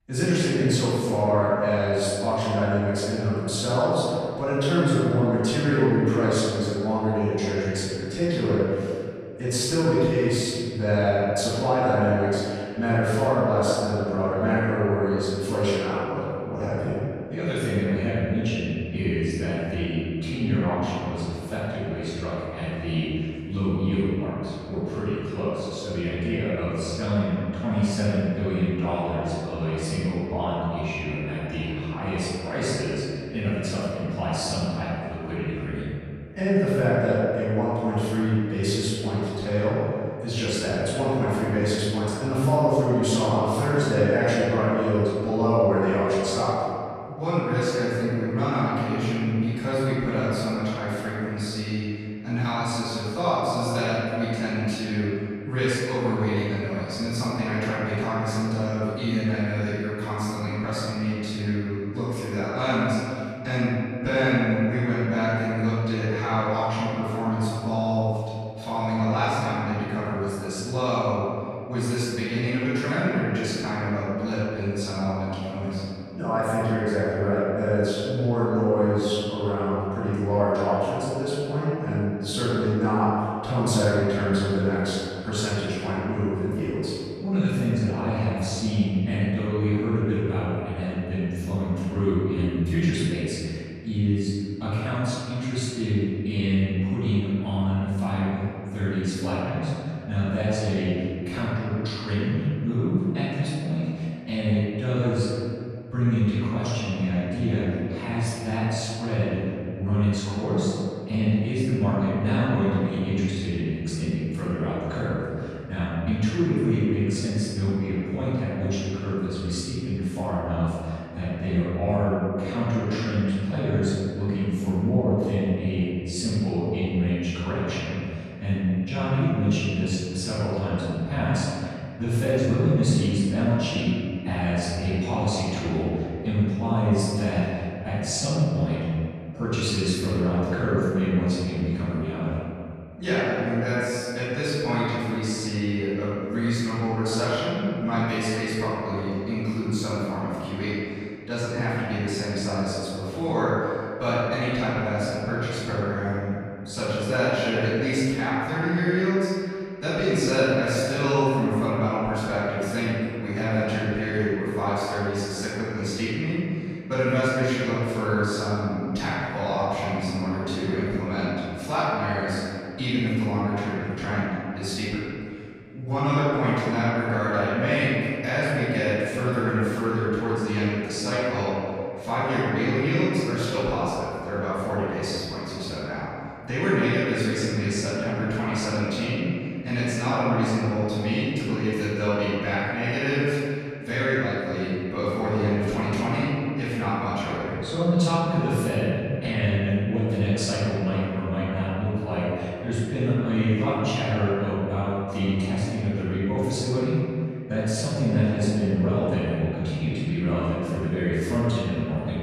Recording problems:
room echo; strong; dies away in 2.2 s
off-mic speech; far

